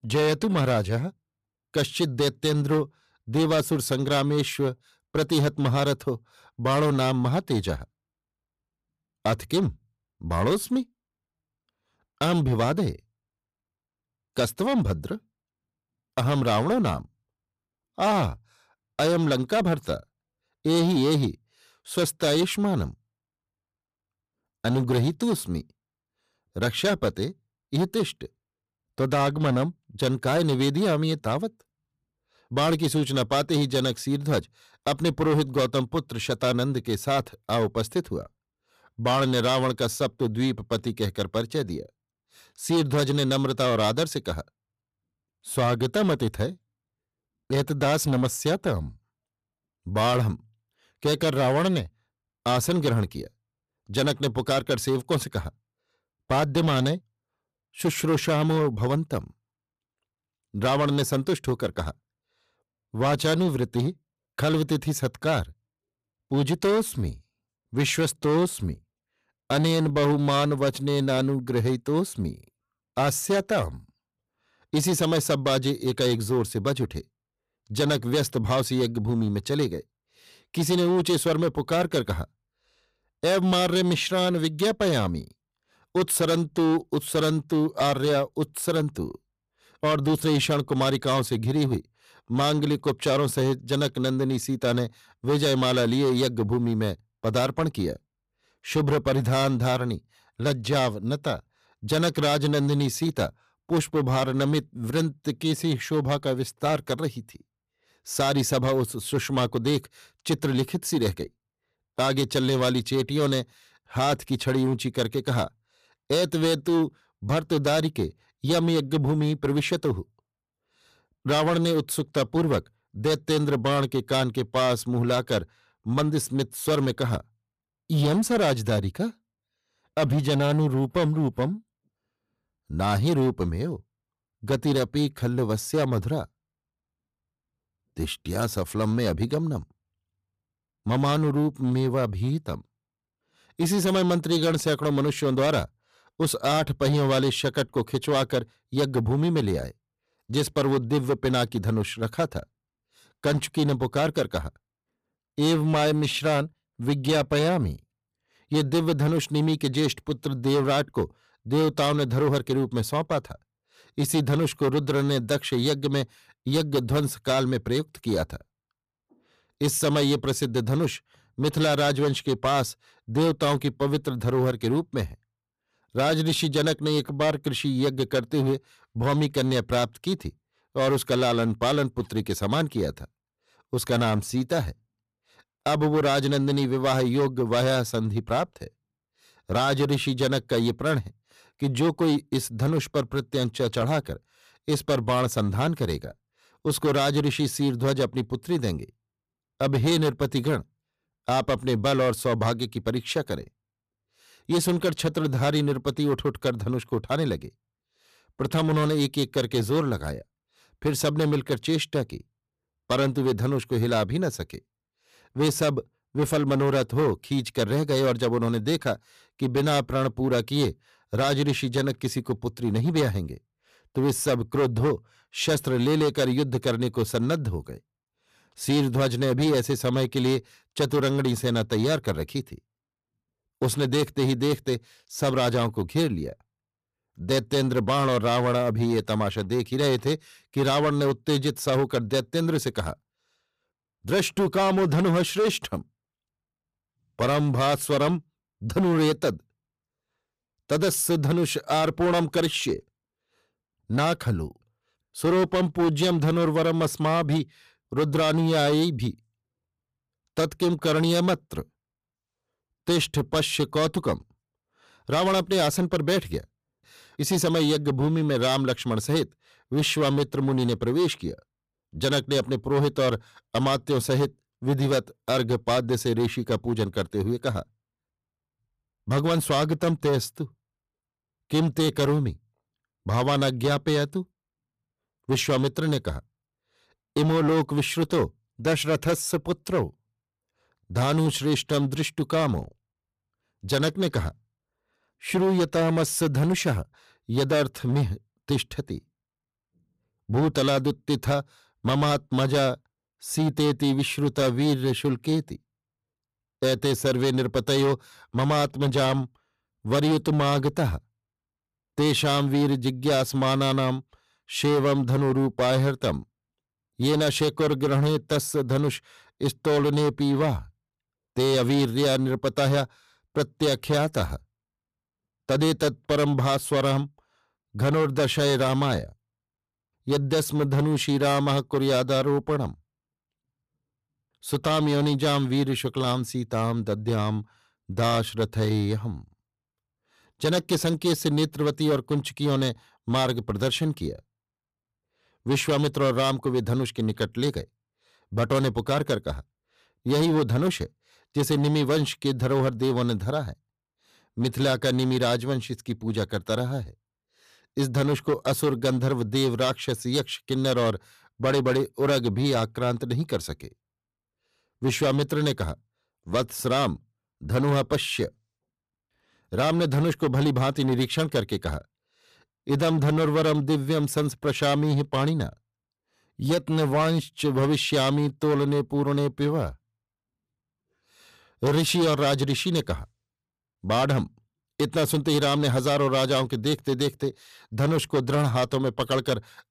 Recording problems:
distortion; slight; 10% of the sound clipped

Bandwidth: 14.5 kHz